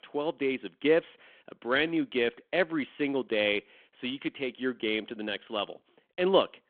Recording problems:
phone-call audio; nothing above 3.5 kHz

